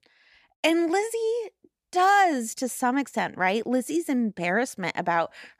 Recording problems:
none

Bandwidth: 14.5 kHz